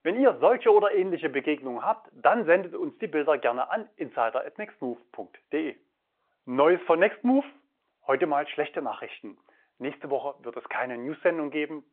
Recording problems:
phone-call audio

